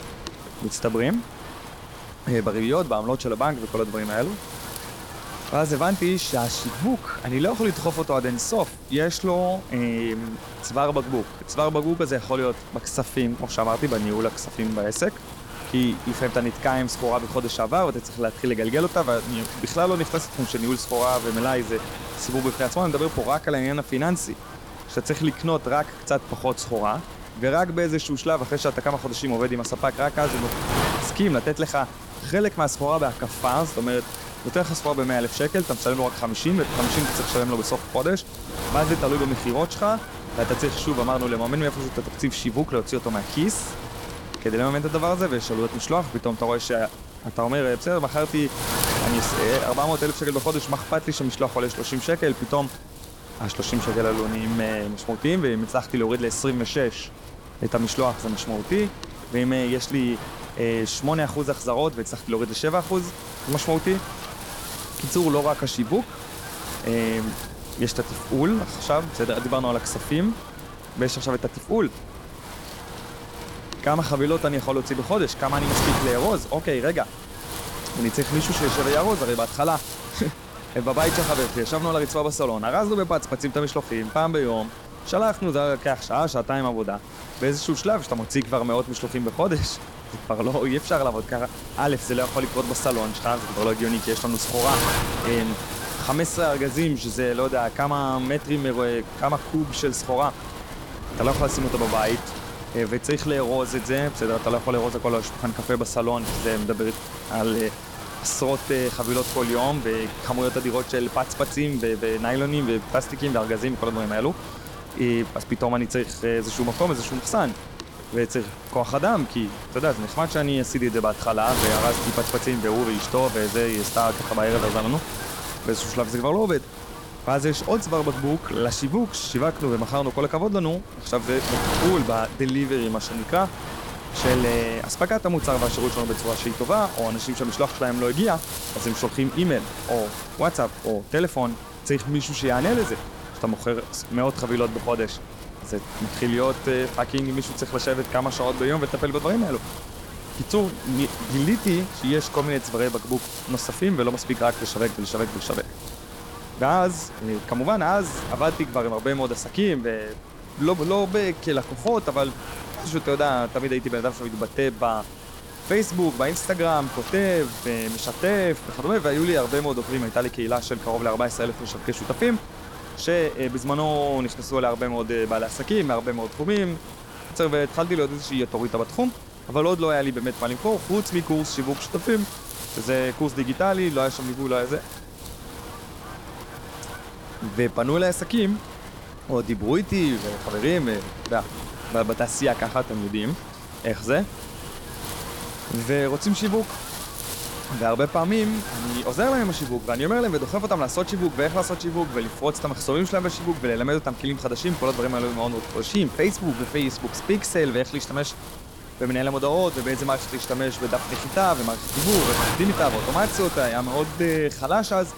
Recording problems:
wind noise on the microphone; heavy; 9 dB below the speech

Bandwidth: 18.5 kHz